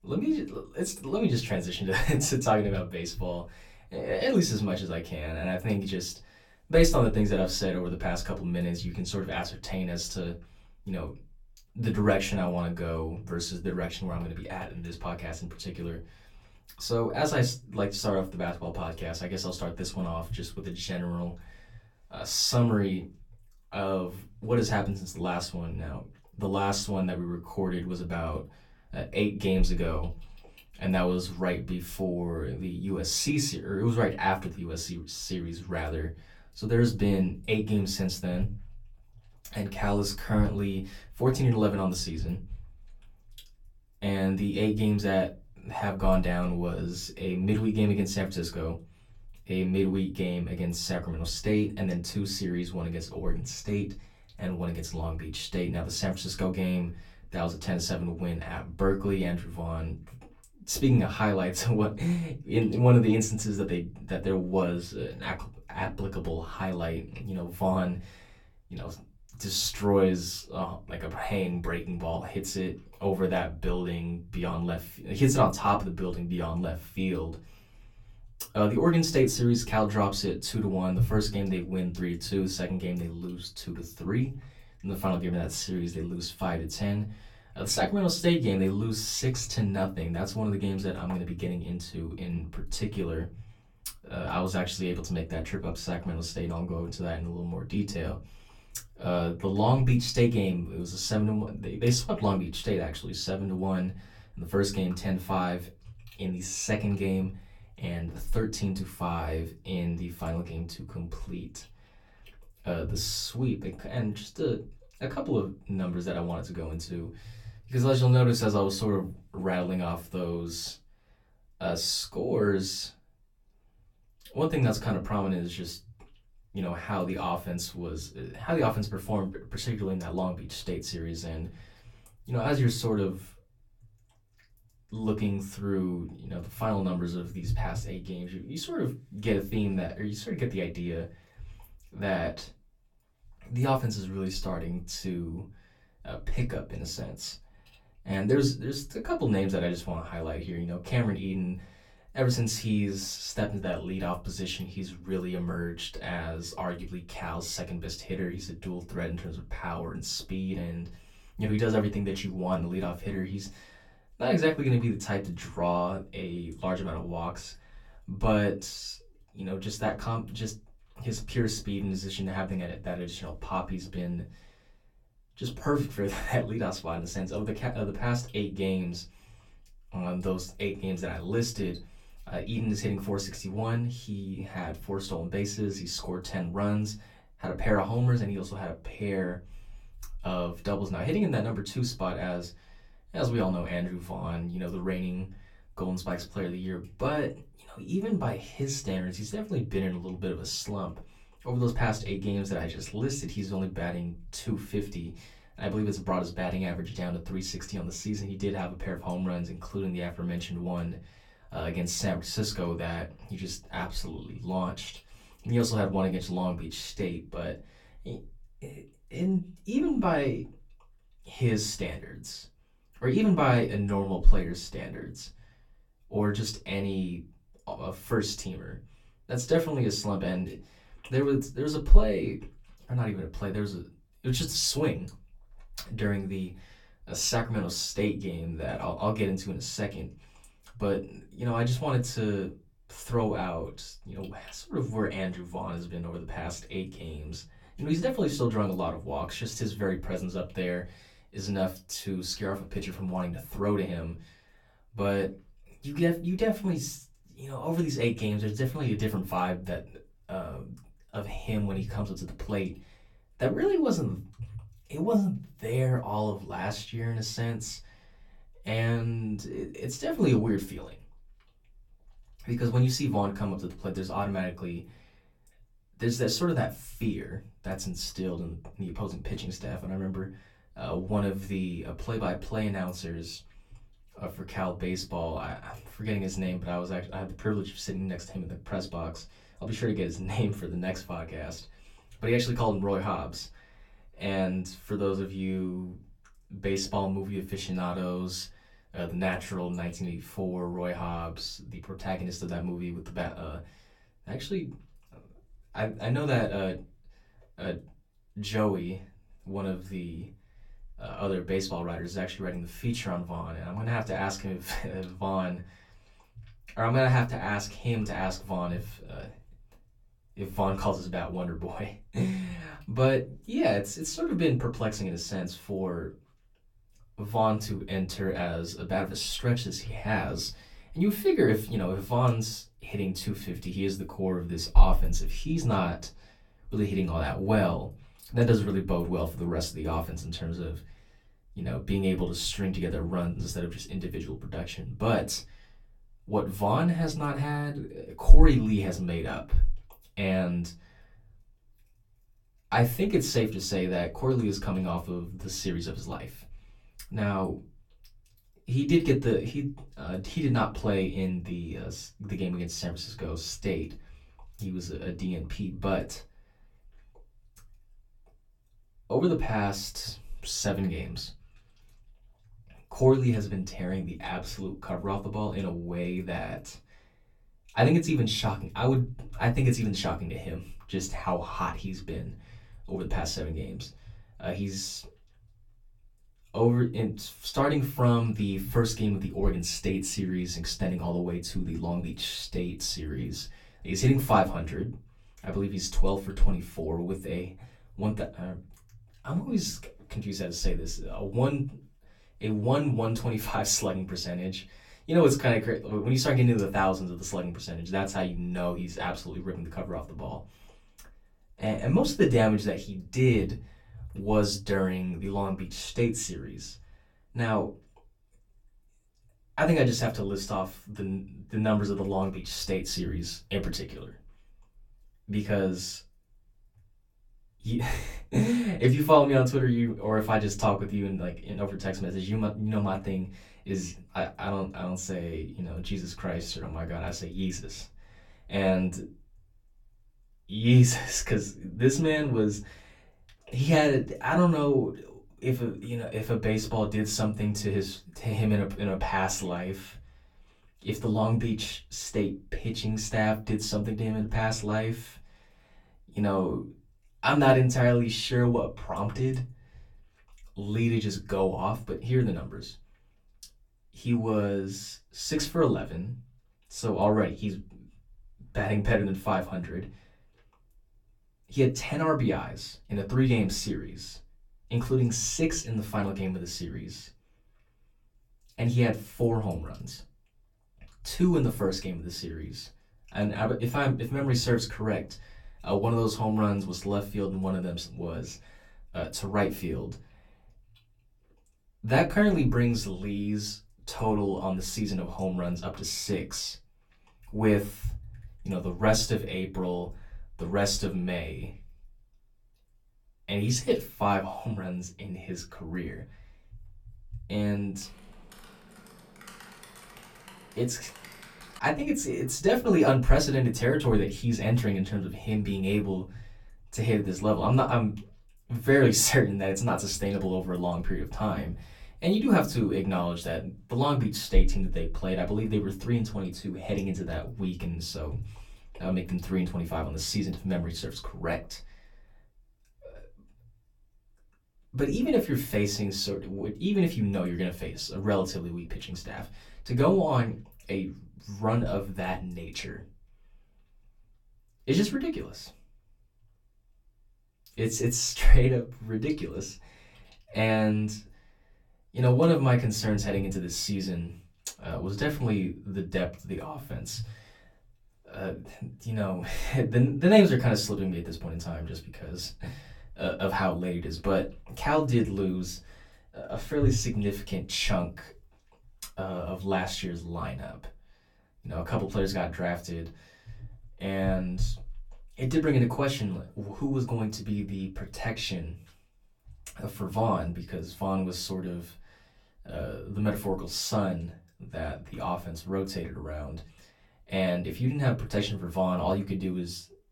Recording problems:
off-mic speech; far
room echo; very slight; dies away in 0.2 s
keyboard typing; faint; from 8:28 to 8:32; peak 15 dB below the speech

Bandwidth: 17.5 kHz